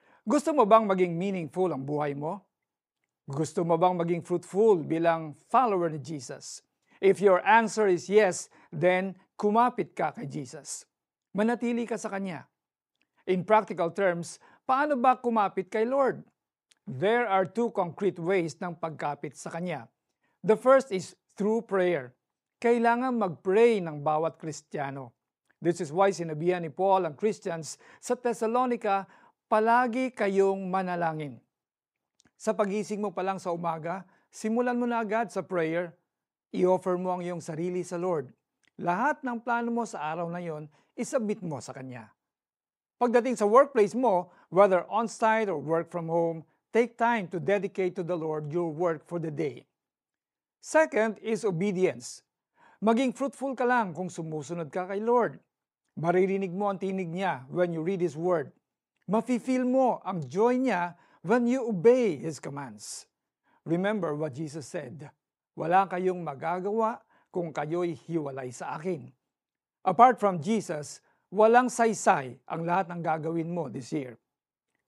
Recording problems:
none

